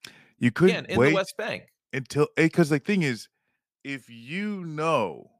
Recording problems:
none

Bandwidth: 15 kHz